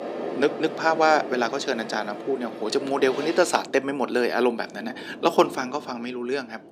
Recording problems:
thin; somewhat; fading below 300 Hz
train or aircraft noise; noticeable; until 3.5 s; 10 dB below the speech
wind noise on the microphone; occasional gusts; 20 dB below the speech

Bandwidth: 15.5 kHz